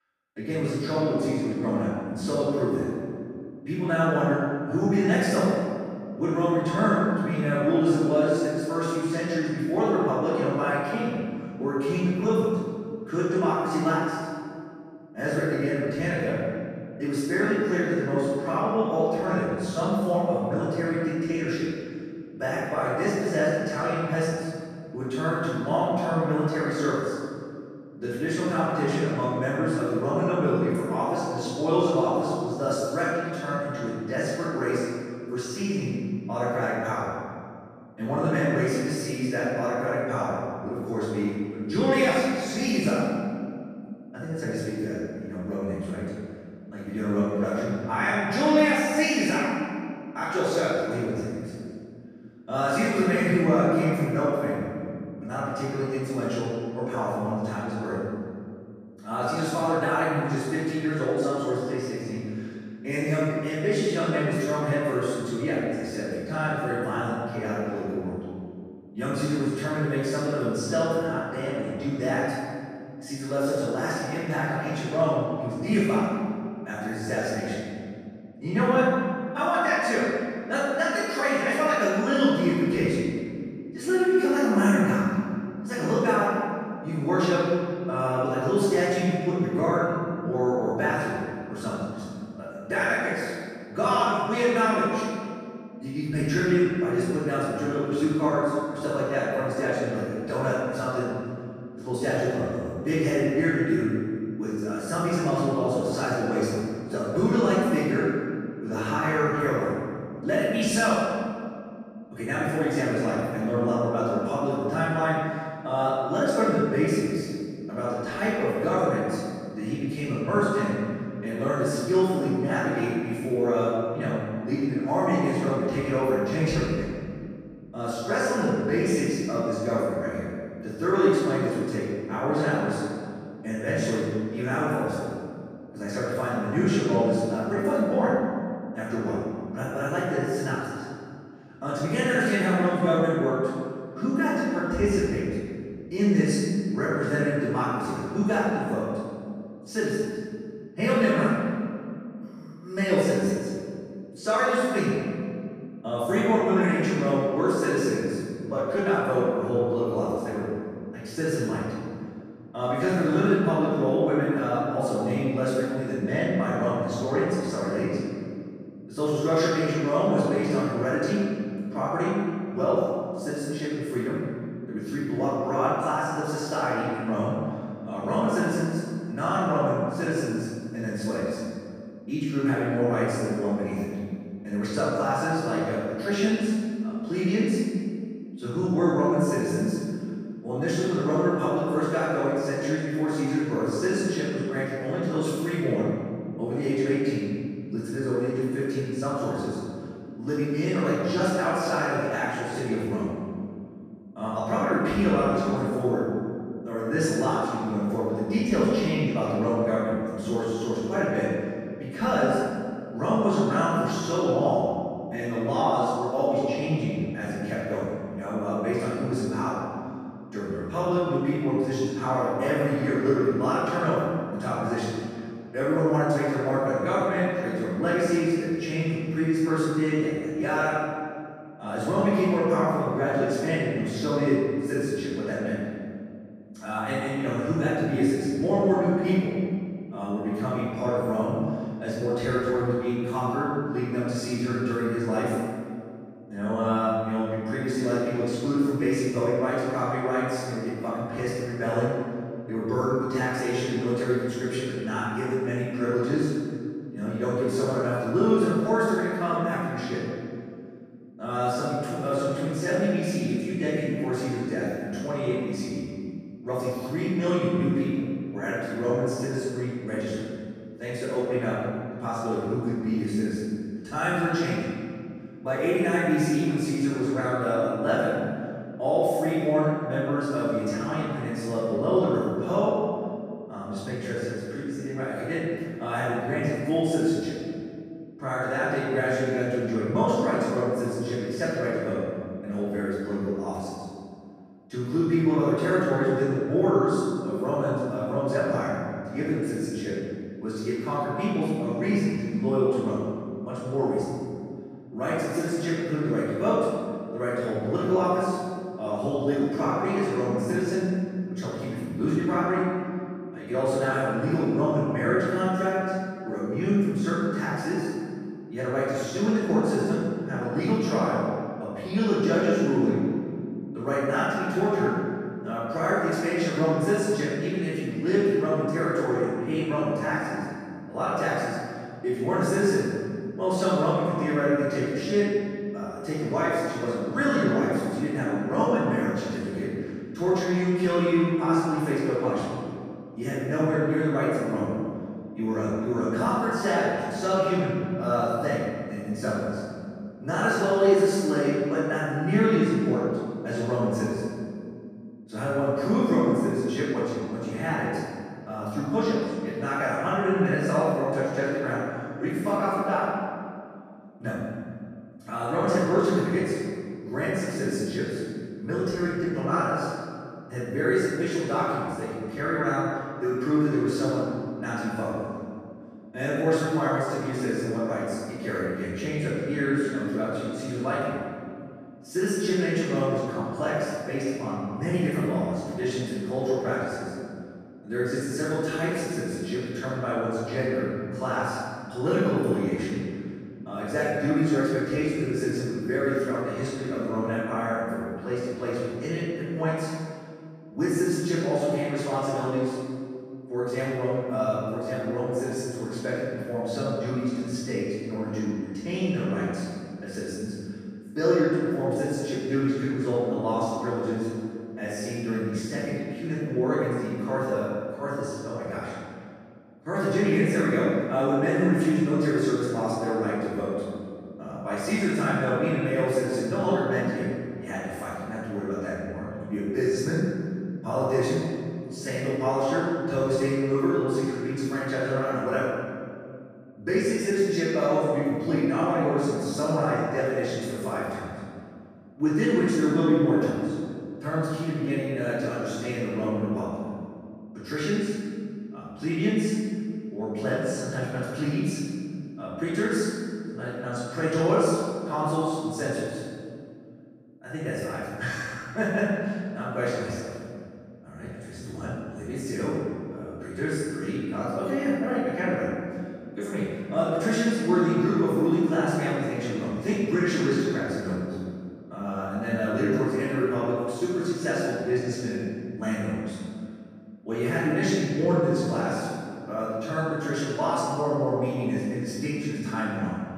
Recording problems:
room echo; strong; dies away in 2.1 s
off-mic speech; far

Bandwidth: 14.5 kHz